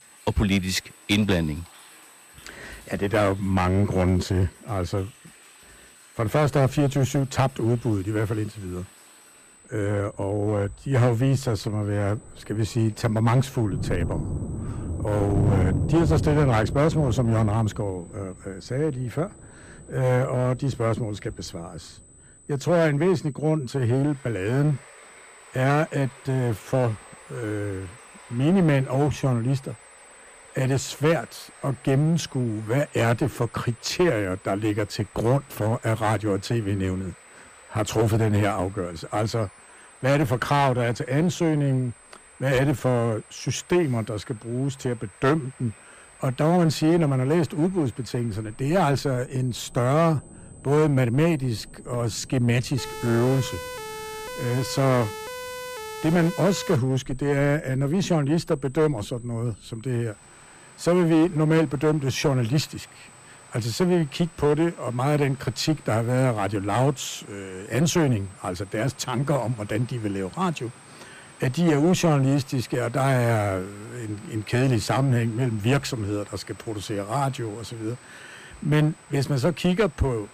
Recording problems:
distortion; slight; 6% of the sound clipped
rain or running water; noticeable; throughout; 15 dB below the speech
high-pitched whine; faint; throughout; 8 kHz, 25 dB below the speech
siren; noticeable; from 53 to 57 s; peak 10 dB below the speech

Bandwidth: 15 kHz